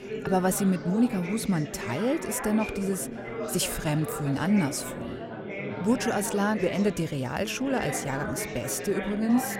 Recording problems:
chatter from many people; loud; throughout; 8 dB below the speech

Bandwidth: 16 kHz